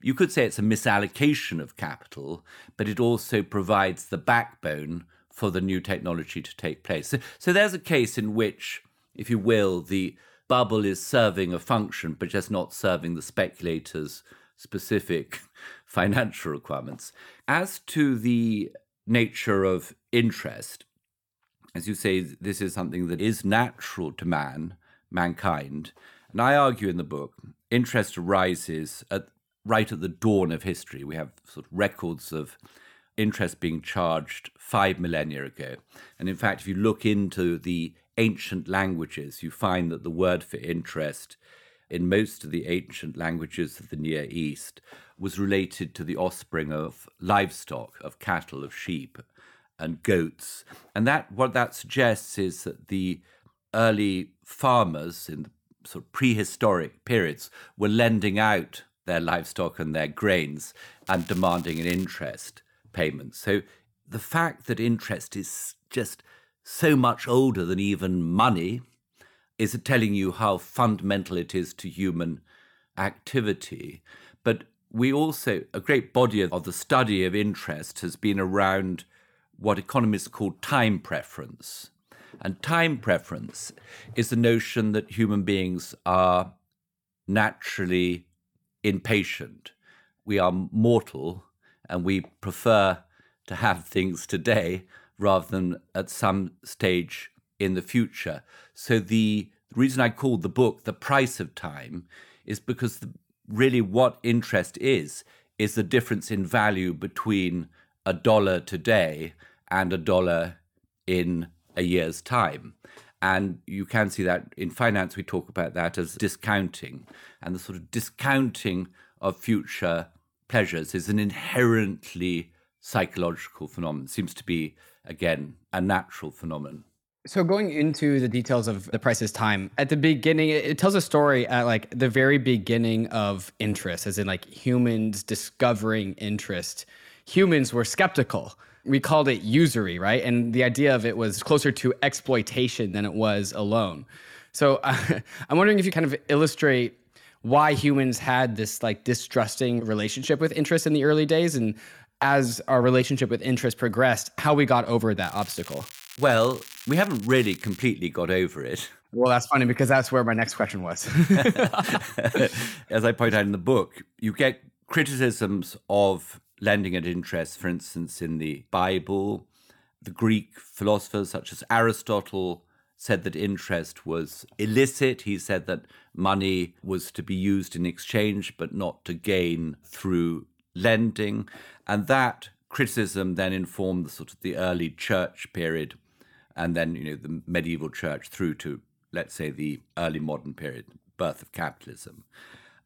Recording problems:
crackling; noticeable; at 1:01 and from 2:35 to 2:38; 15 dB below the speech

